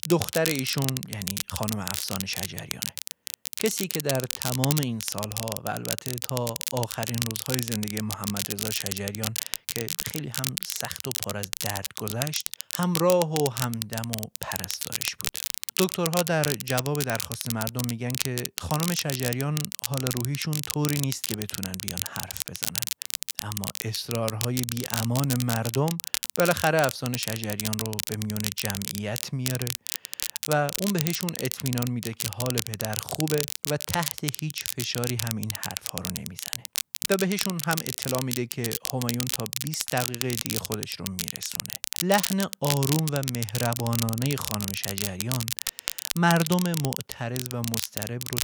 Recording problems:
crackle, like an old record; loud; 1 dB below the speech

